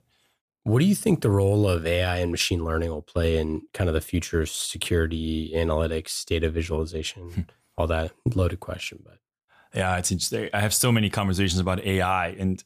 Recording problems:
none

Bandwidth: 14.5 kHz